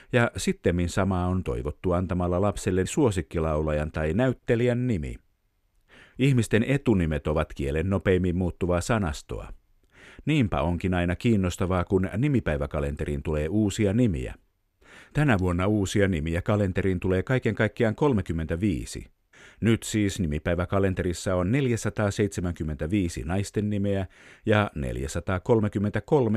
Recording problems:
abrupt cut into speech; at the end

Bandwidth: 13.5 kHz